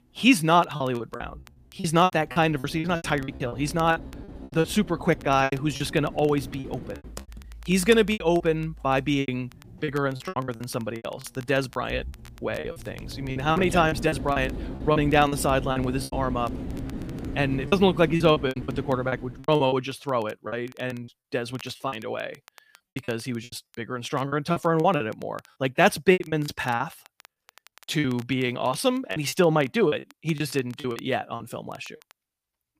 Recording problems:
machinery noise; noticeable; until 19 s; 15 dB below the speech
crackle, like an old record; faint; 25 dB below the speech
choppy; very; 13% of the speech affected

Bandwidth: 15 kHz